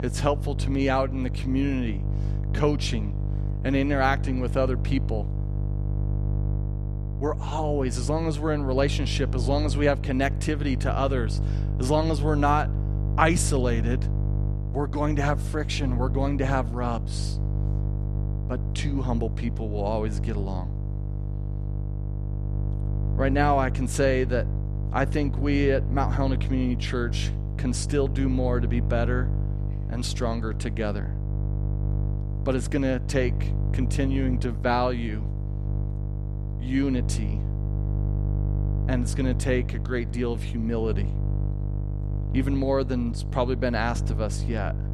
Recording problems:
electrical hum; noticeable; throughout; 50 Hz, 15 dB below the speech

